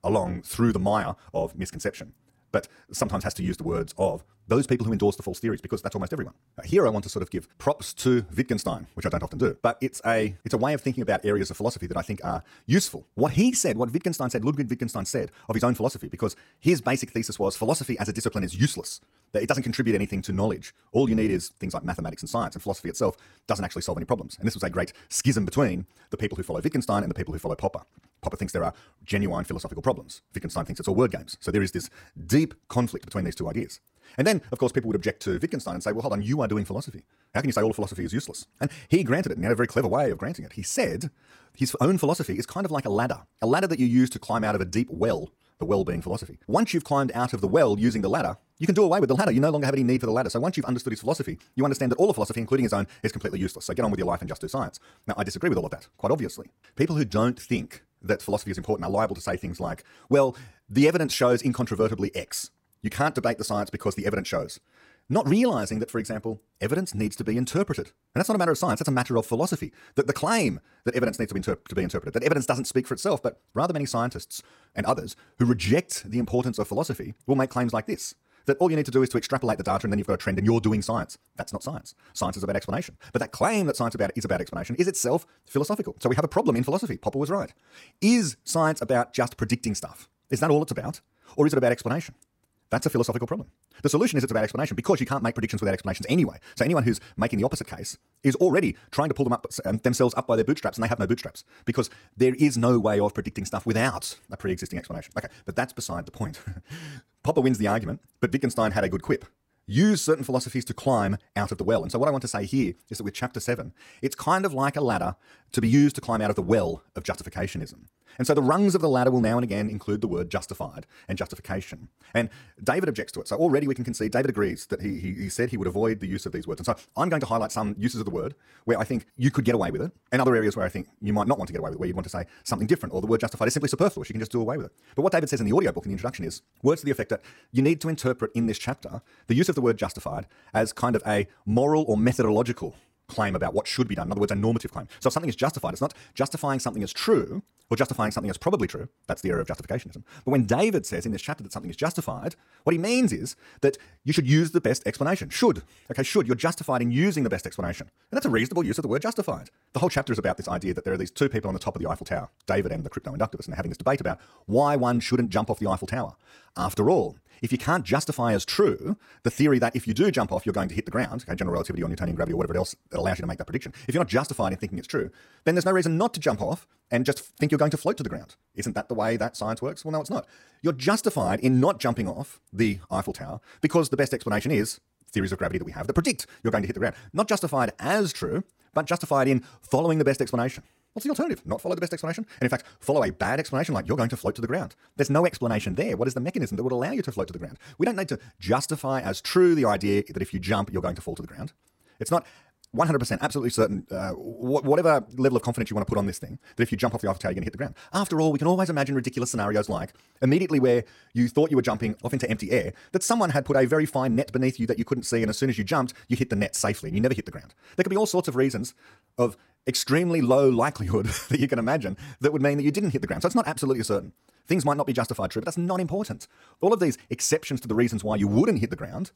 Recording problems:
wrong speed, natural pitch; too fast; 1.6 times normal speed

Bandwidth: 16.5 kHz